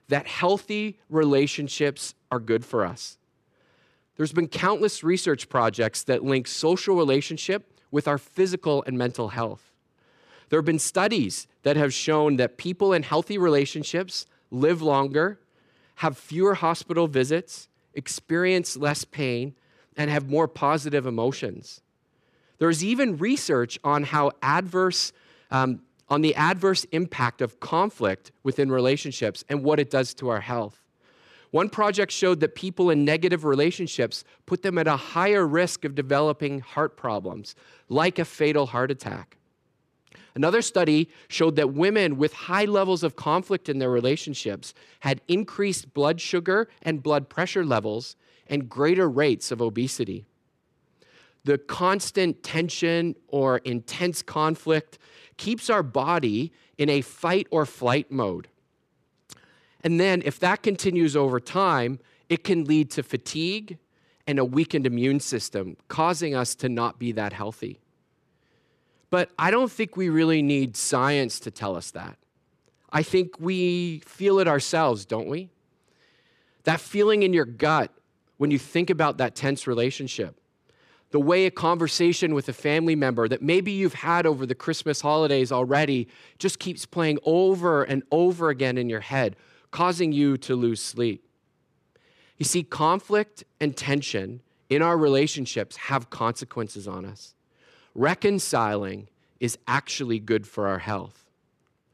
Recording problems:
none

